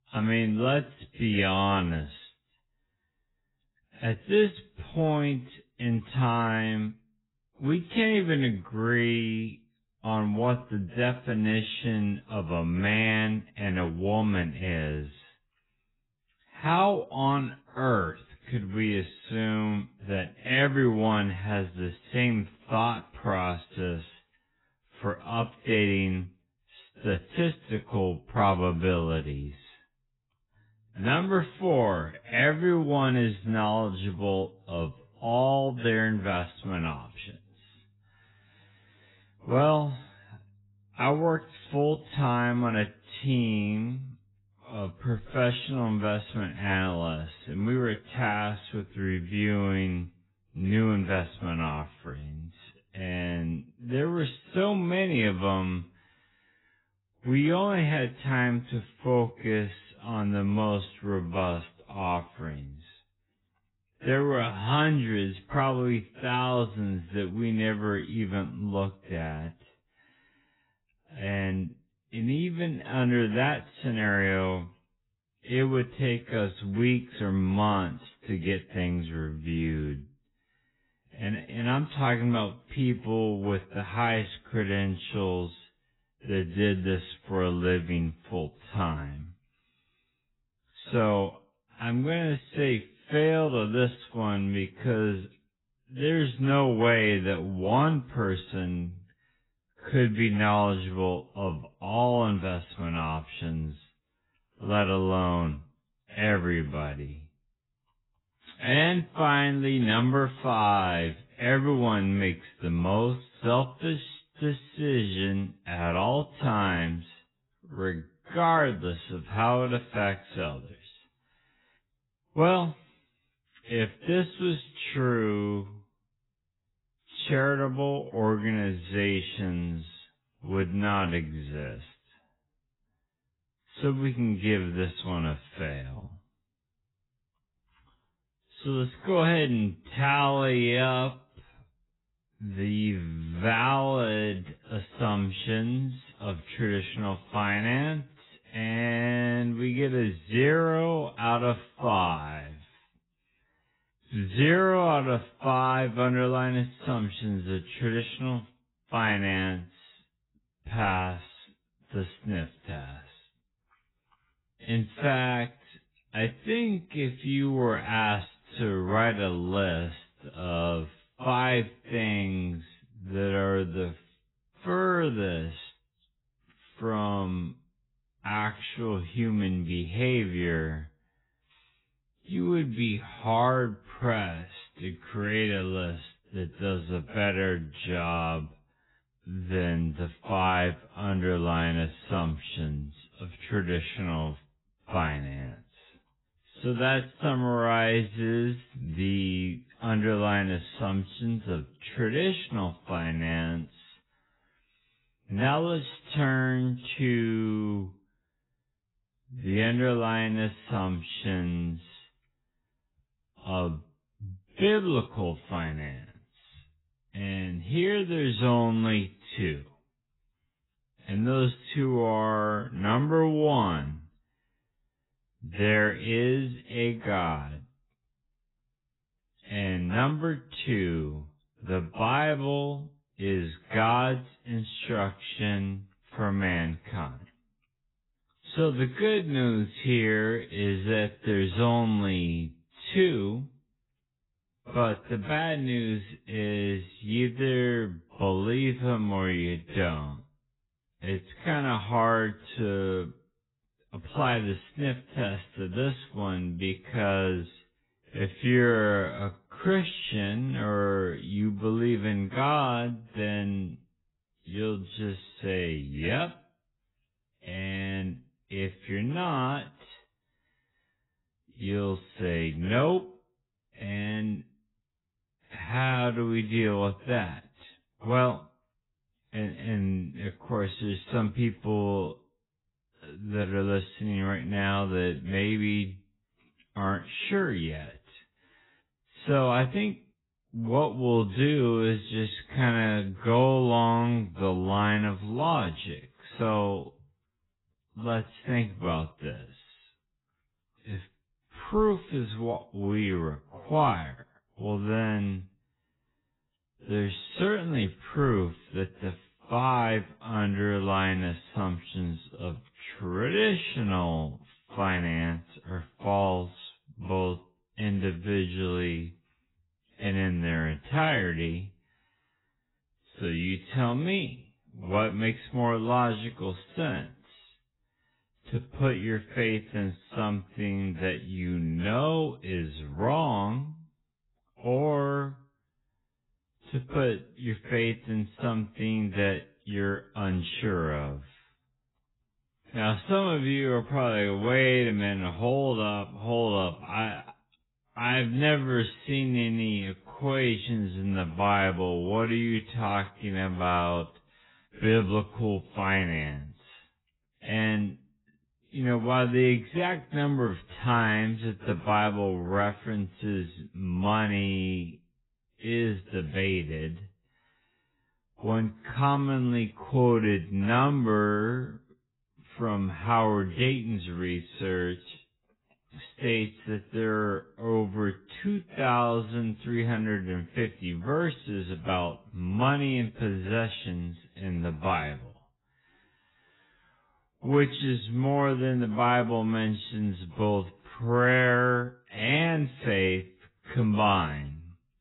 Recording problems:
garbled, watery; badly; nothing above 4 kHz
wrong speed, natural pitch; too slow; 0.5 times normal speed

